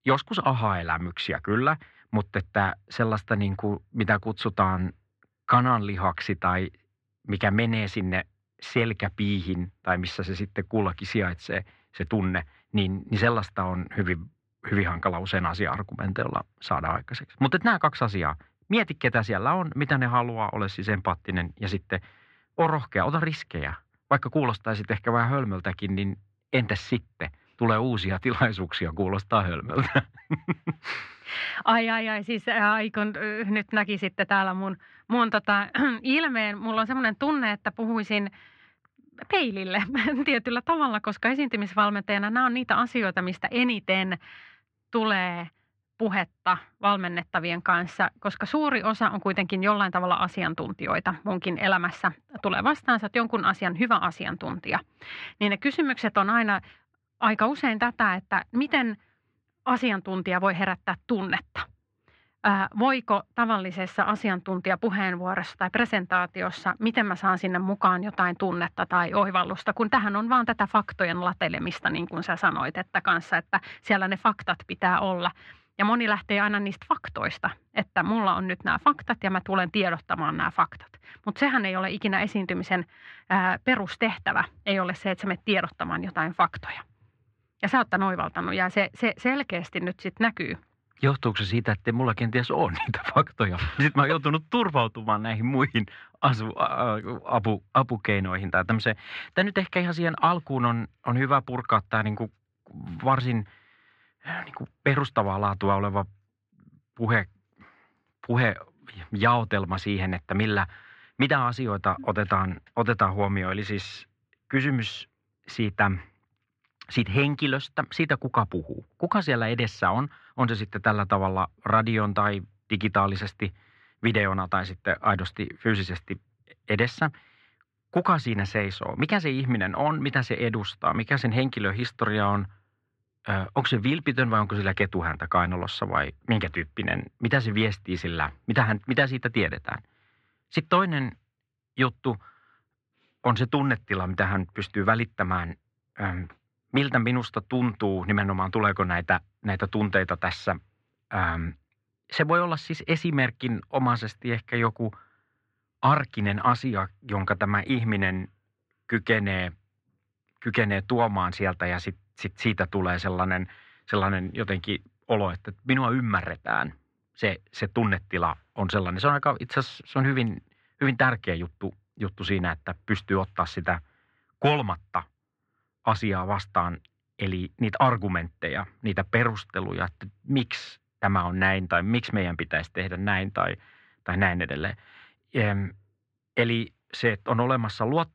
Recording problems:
muffled; very; fading above 3 kHz

